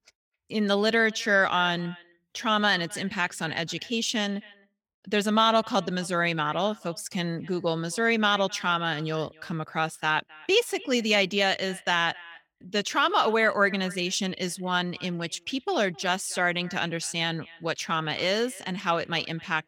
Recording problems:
echo of what is said; faint; throughout; 260 ms later, 20 dB below the speech

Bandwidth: 18.5 kHz